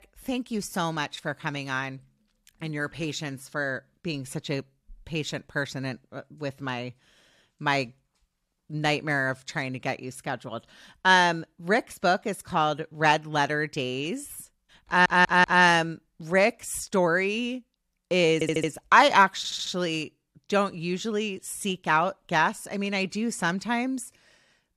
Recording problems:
audio stuttering; at 15 s, at 18 s and at 19 s

